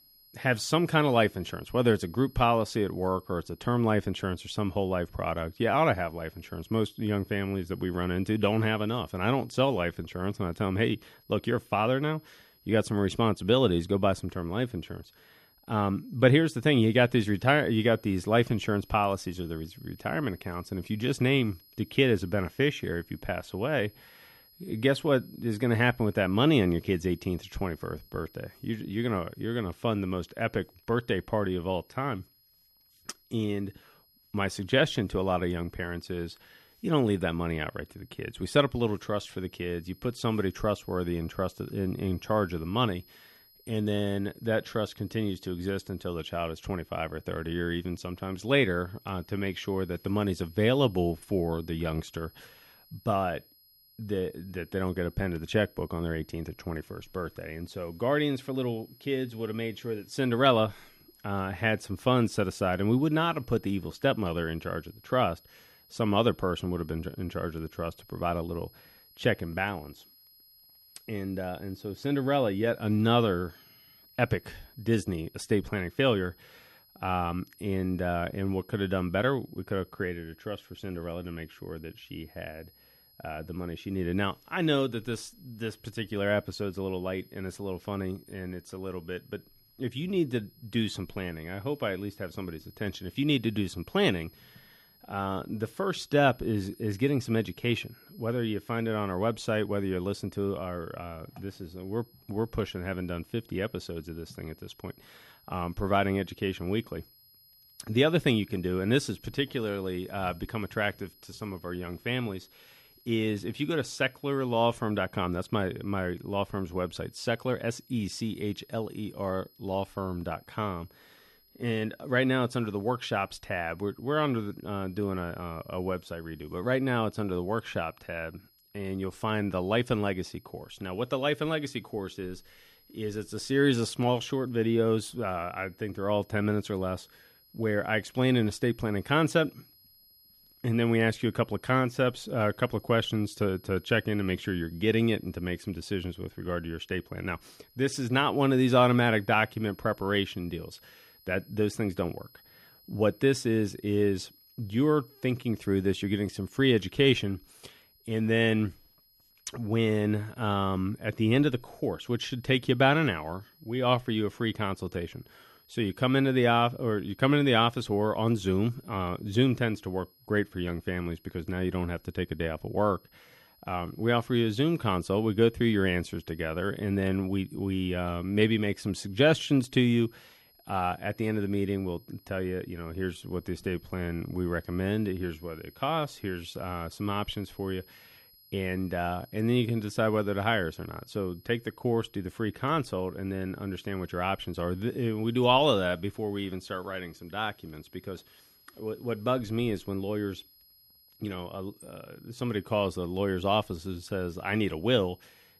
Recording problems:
high-pitched whine; faint; throughout; 11.5 kHz, 30 dB below the speech

